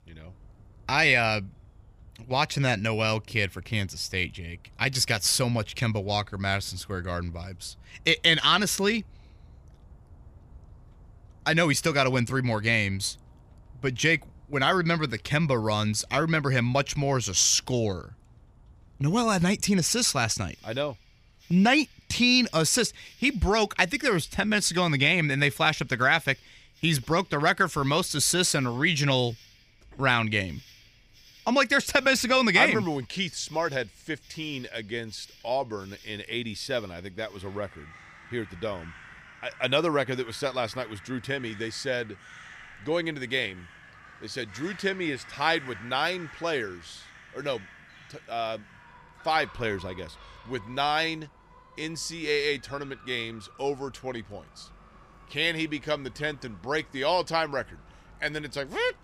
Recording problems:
animal sounds; faint; throughout; 25 dB below the speech

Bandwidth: 15 kHz